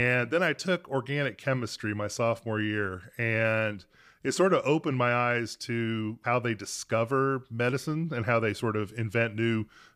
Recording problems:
abrupt cut into speech; at the start

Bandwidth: 15 kHz